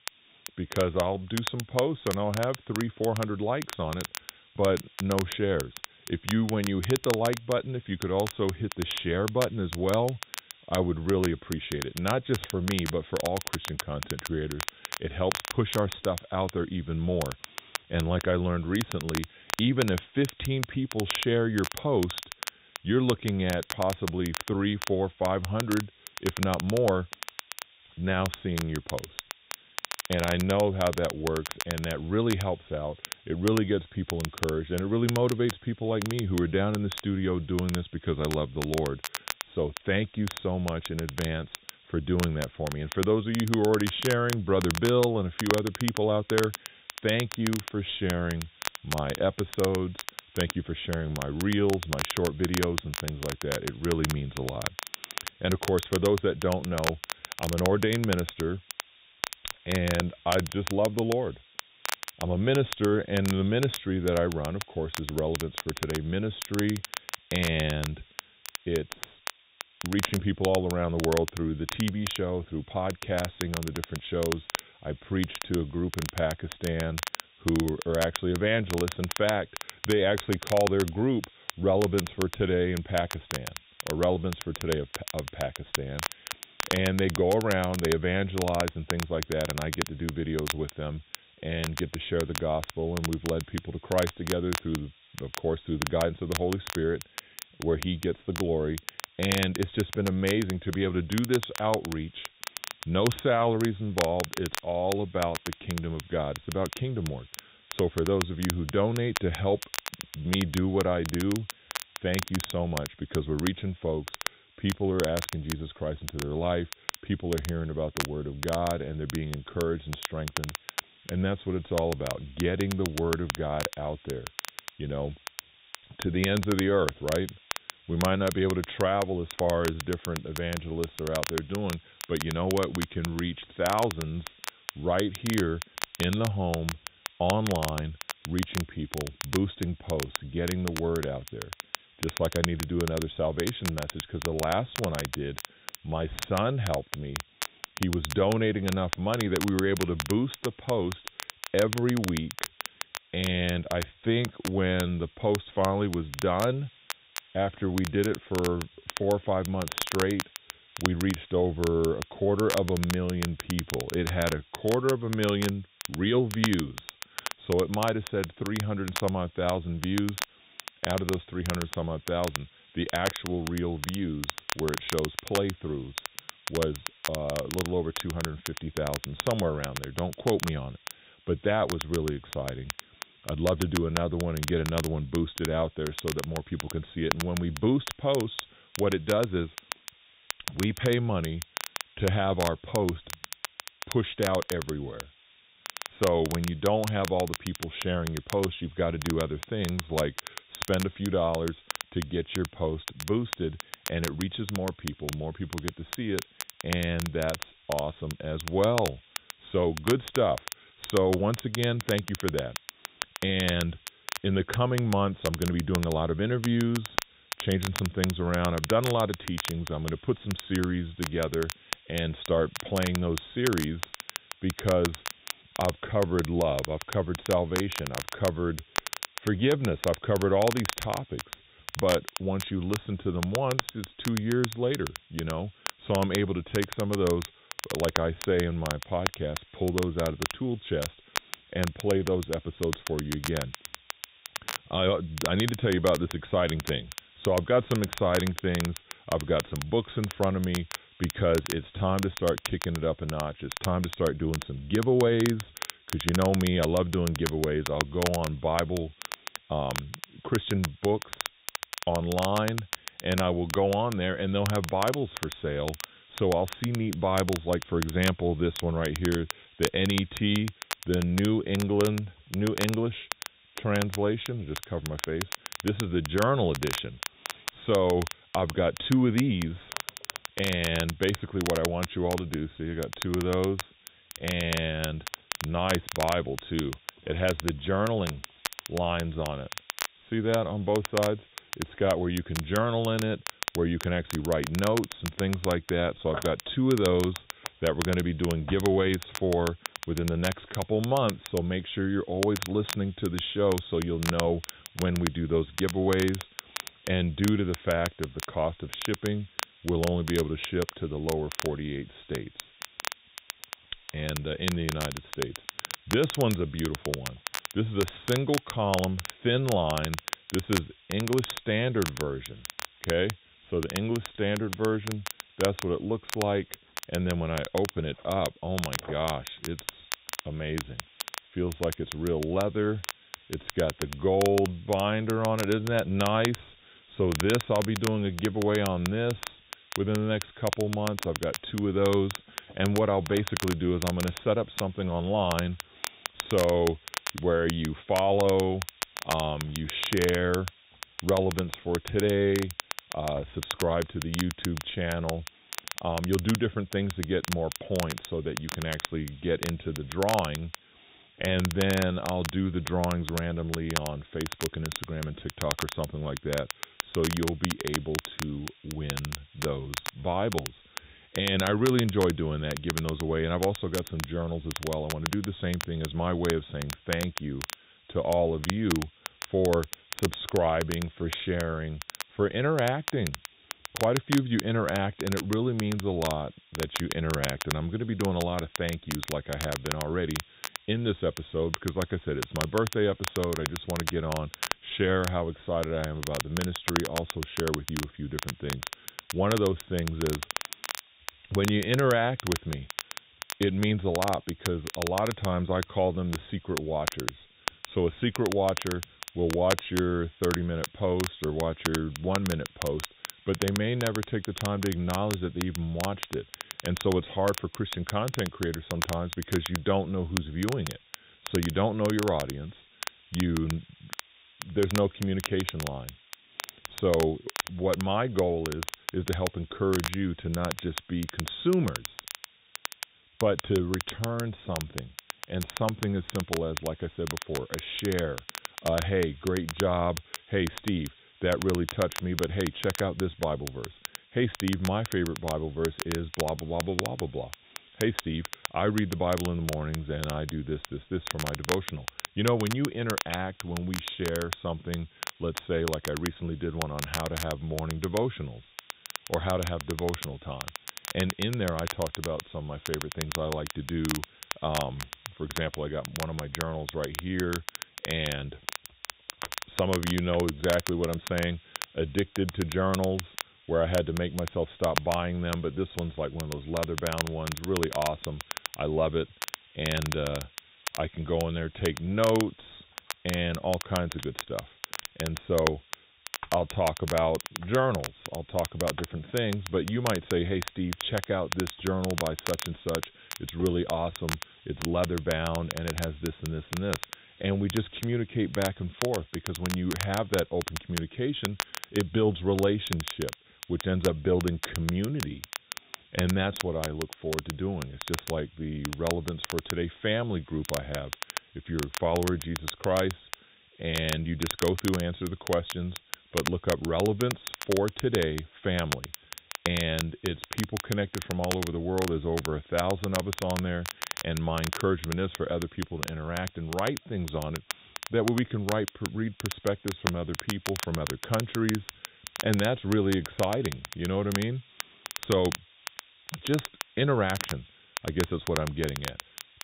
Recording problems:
high frequencies cut off; severe; nothing above 3.5 kHz
crackle, like an old record; loud; 8 dB below the speech
hiss; faint; throughout; 25 dB below the speech

